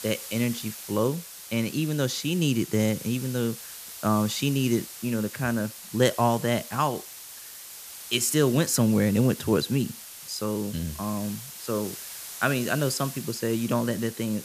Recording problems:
hiss; noticeable; throughout; 10 dB below the speech

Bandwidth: 14.5 kHz